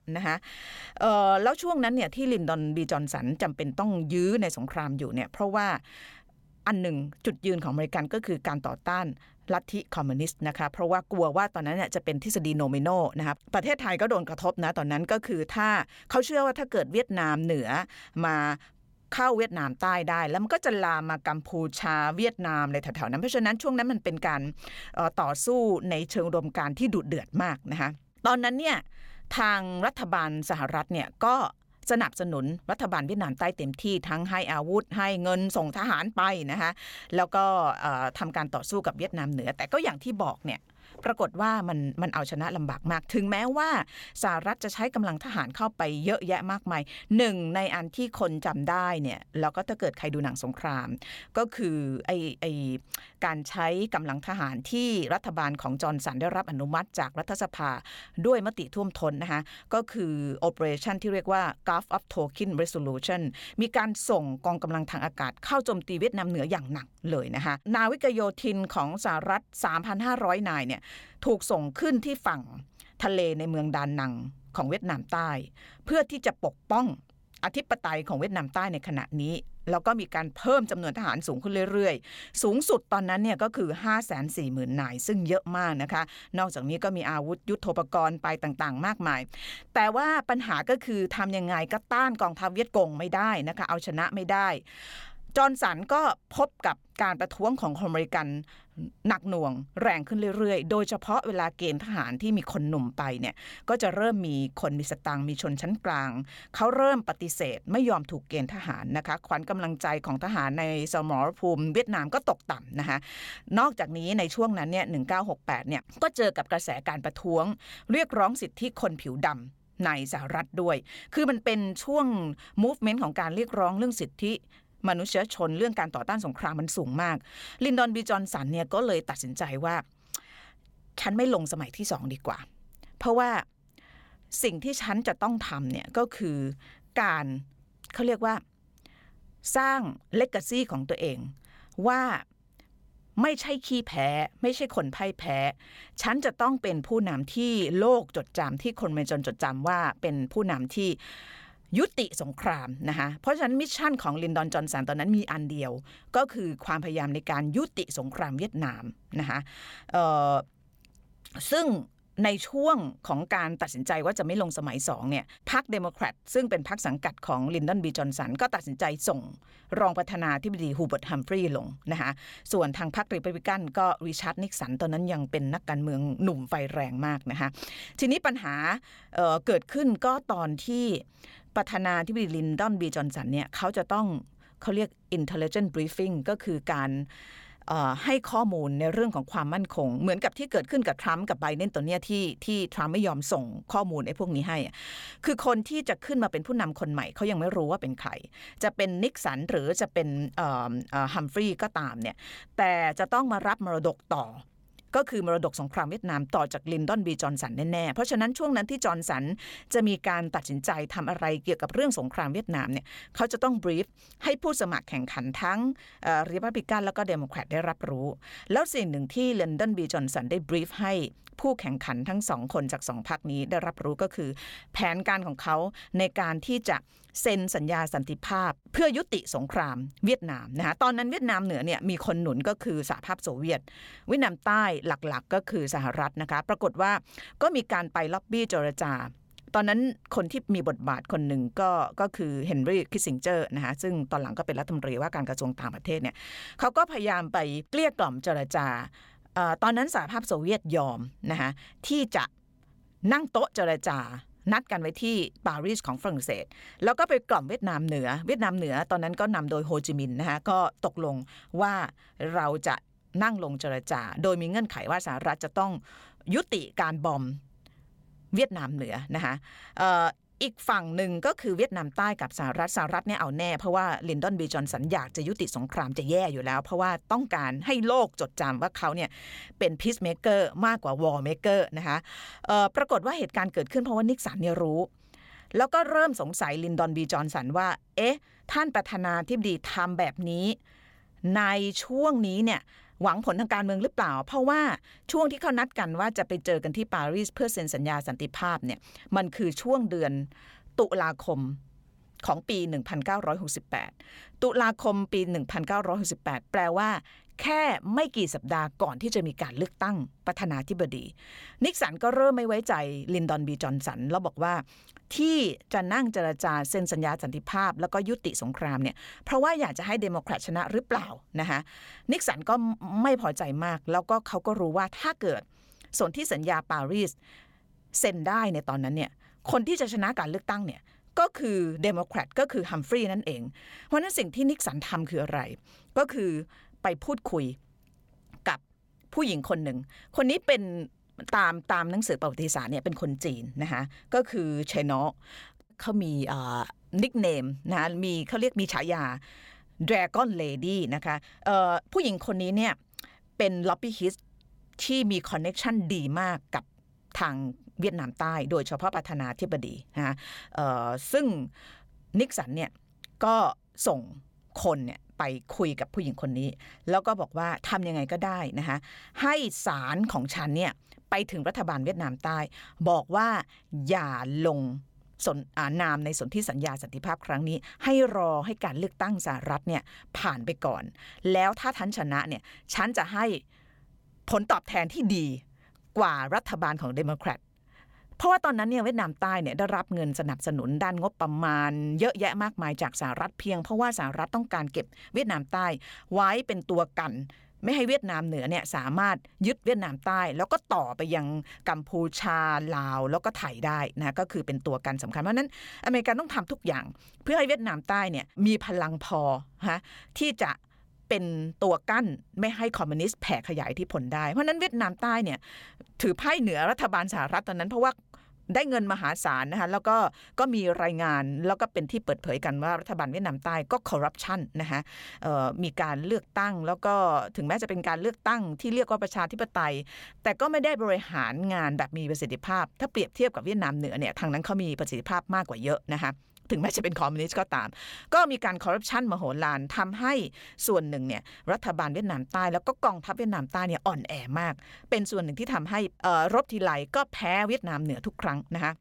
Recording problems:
uneven, jittery; strongly; from 6.5 s to 5:52

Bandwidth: 17 kHz